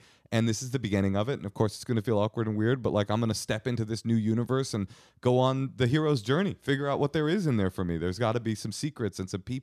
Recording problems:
none

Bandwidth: 14.5 kHz